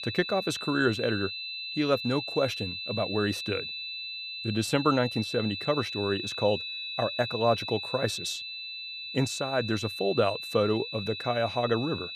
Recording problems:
high-pitched whine; loud; throughout; 4 kHz, 5 dB below the speech

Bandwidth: 15 kHz